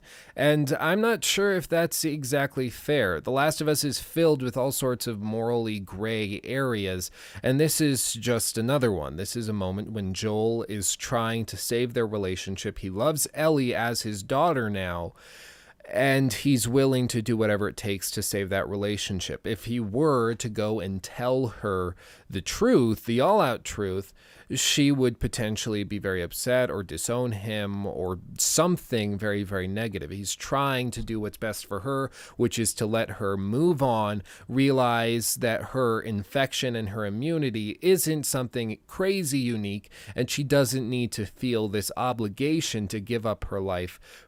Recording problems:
none

